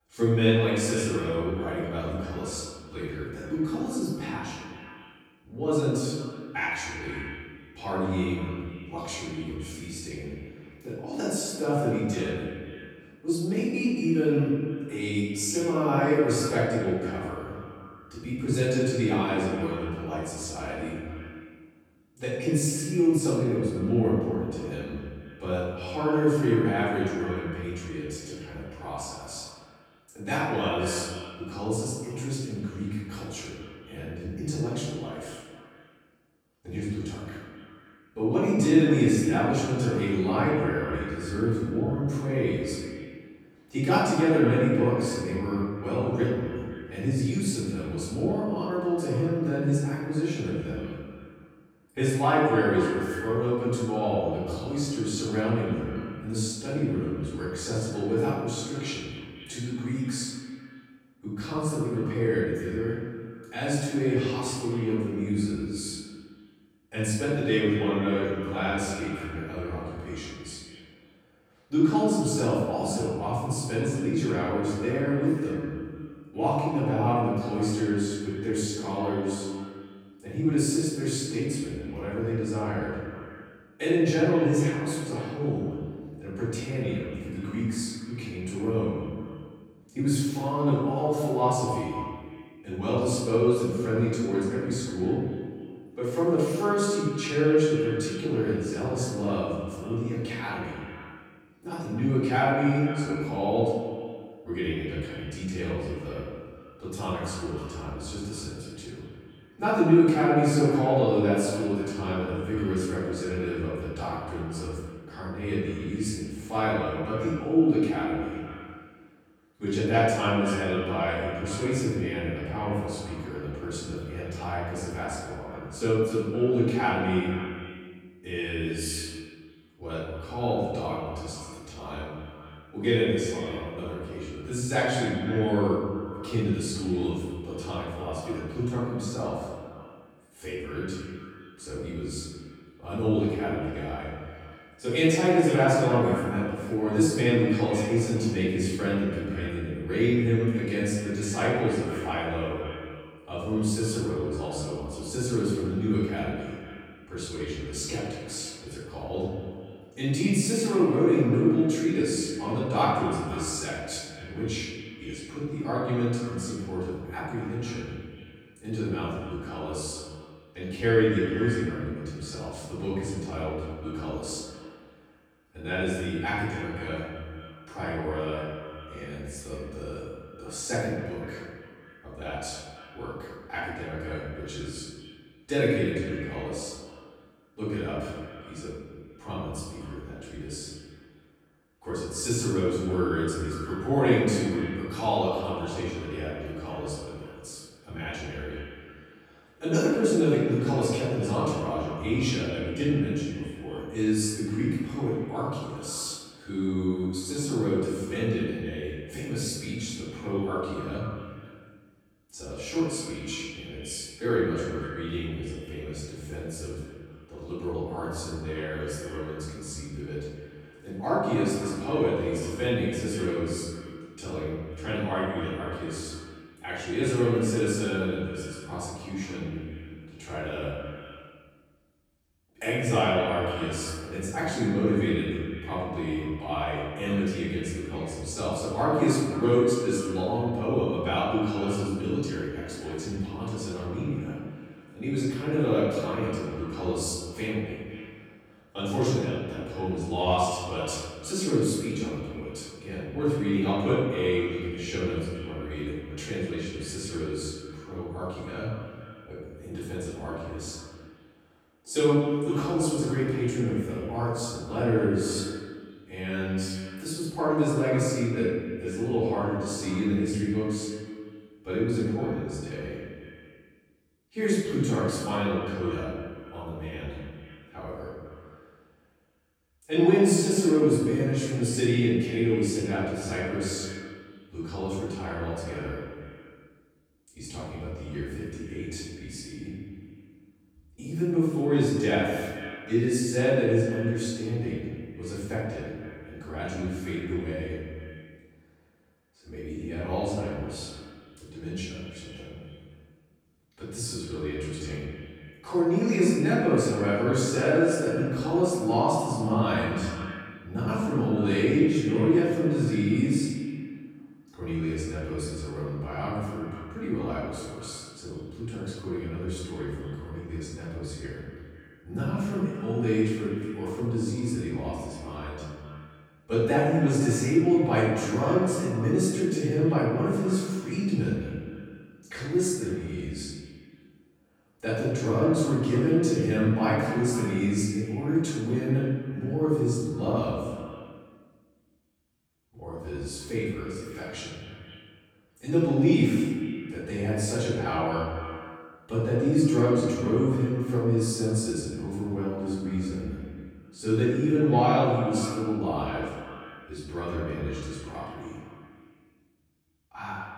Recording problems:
room echo; strong; dies away in 1.3 s
off-mic speech; far
echo of what is said; noticeable; throughout; 250 ms later, 15 dB below the speech

